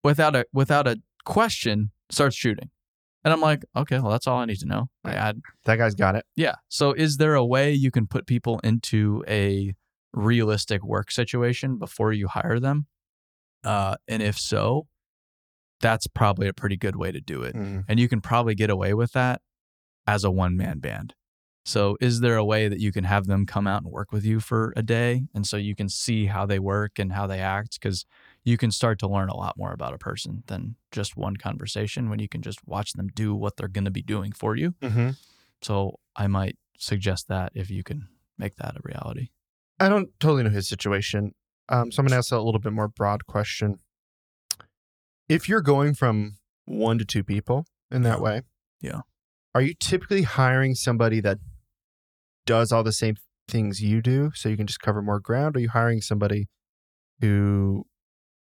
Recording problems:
none

